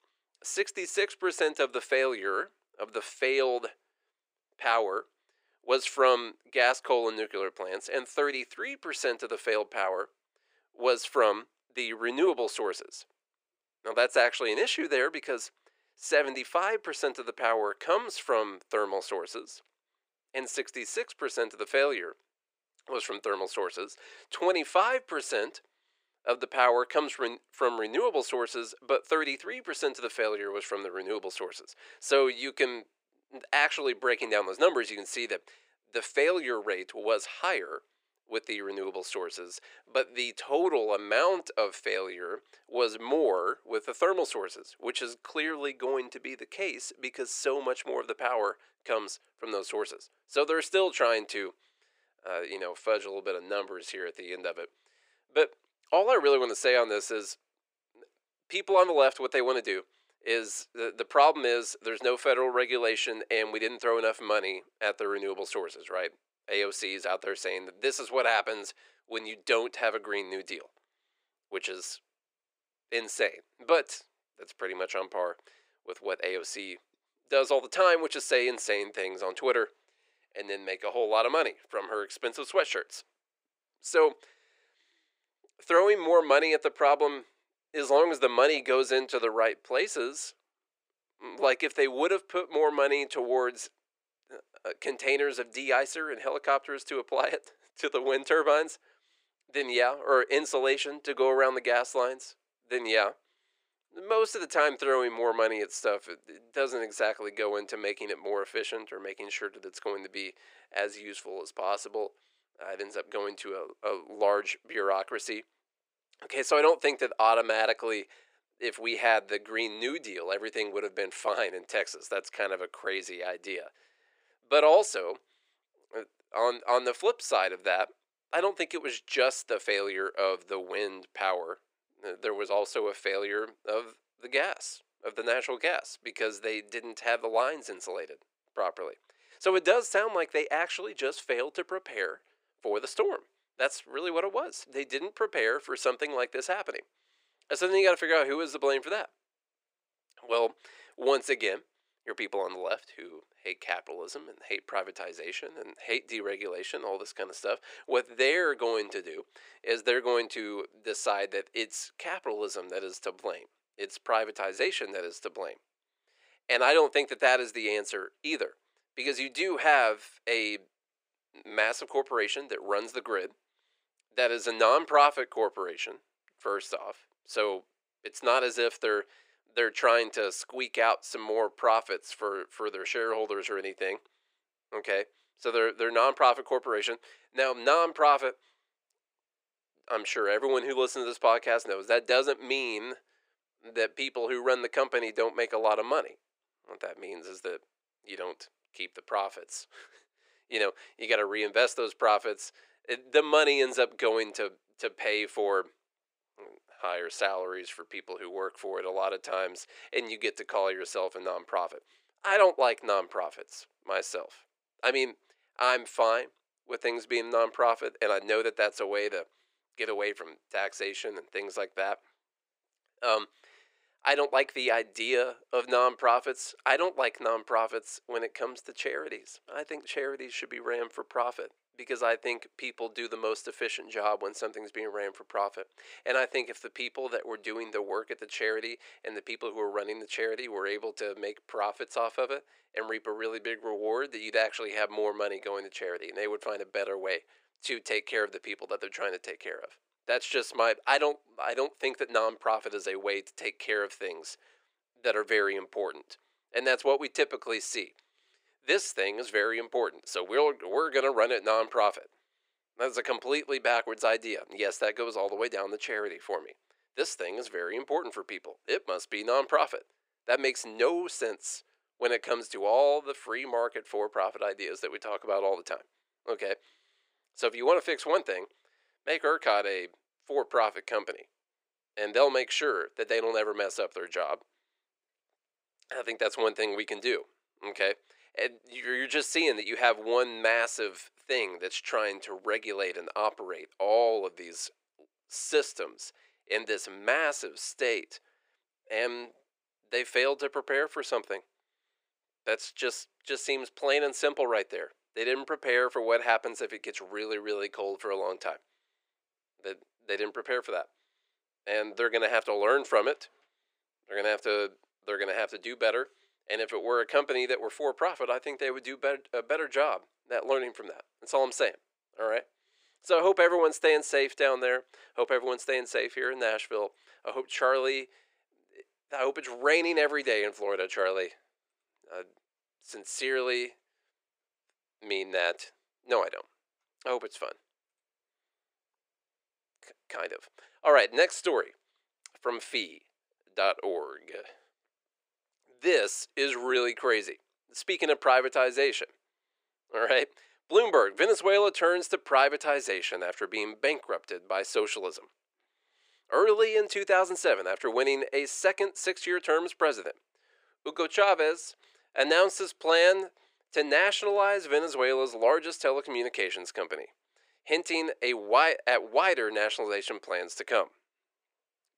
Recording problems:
thin; very; fading below 400 Hz

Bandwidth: 15.5 kHz